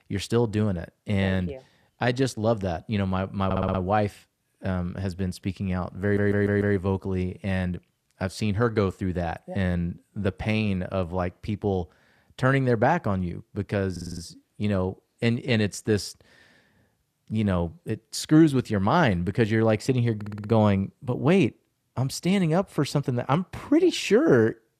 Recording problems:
audio stuttering; 4 times, first at 3.5 s

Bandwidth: 14.5 kHz